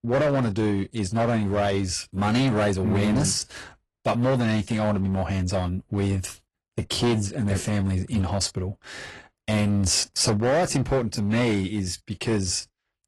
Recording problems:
distortion; slight; 11% of the sound clipped
garbled, watery; slightly

